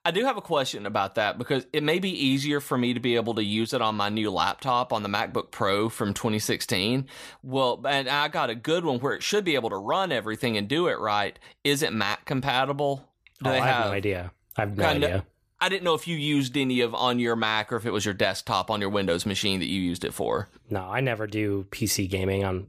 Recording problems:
none

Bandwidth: 14.5 kHz